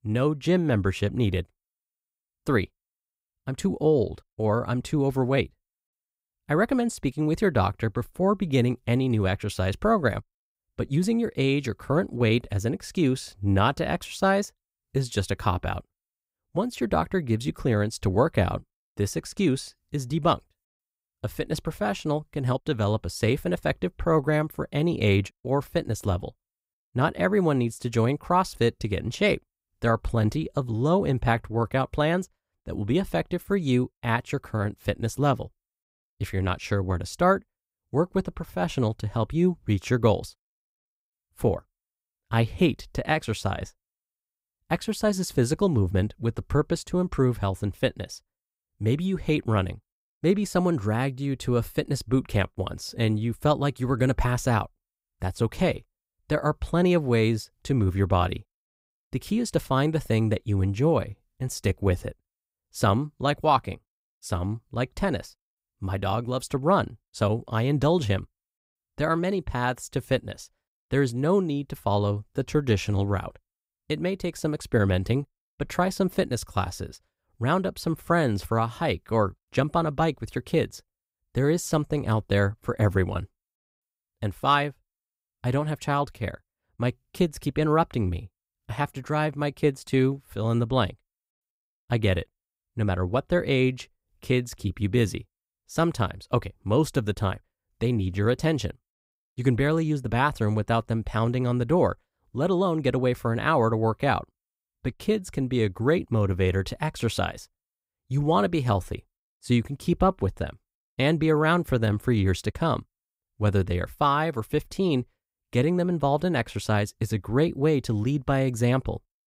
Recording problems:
none

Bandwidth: 15.5 kHz